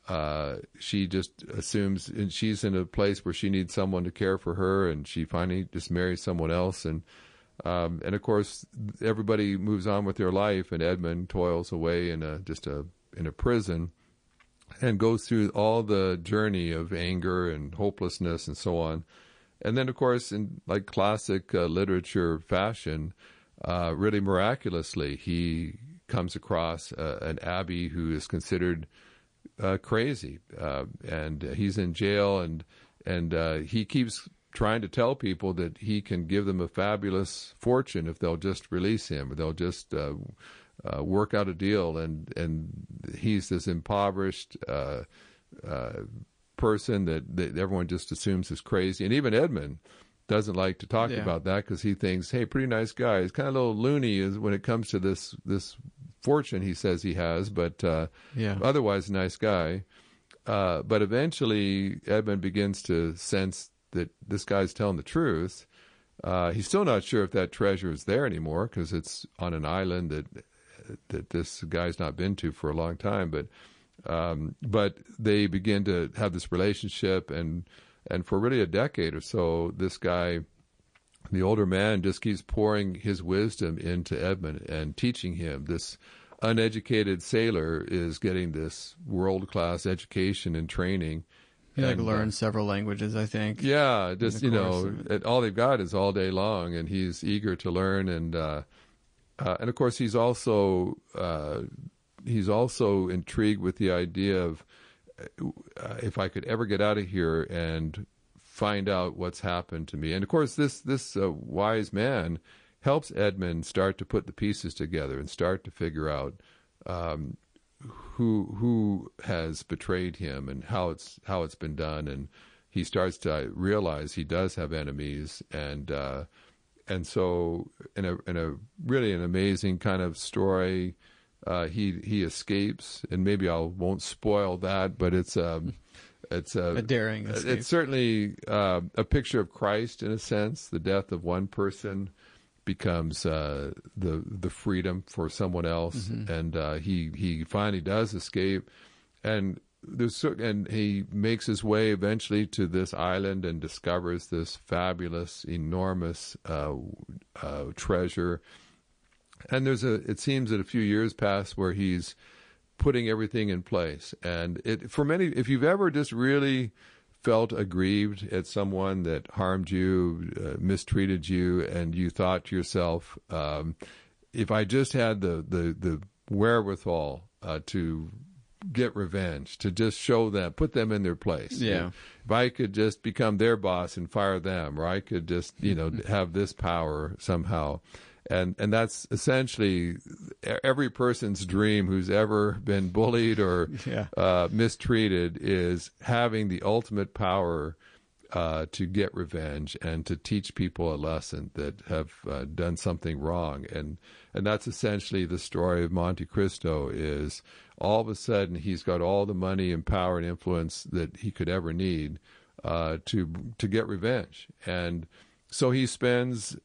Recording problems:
garbled, watery; slightly; nothing above 9 kHz

